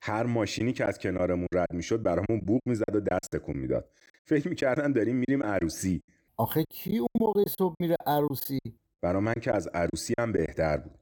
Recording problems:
choppy; very; 10% of the speech affected

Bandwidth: 17.5 kHz